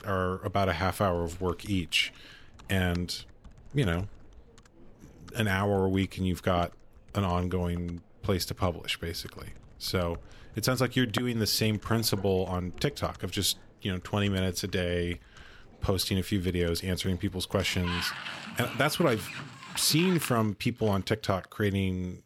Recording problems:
household noises; noticeable; throughout; 15 dB below the speech

